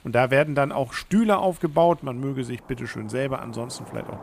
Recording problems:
rain or running water; faint; throughout; 25 dB below the speech

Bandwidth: 15 kHz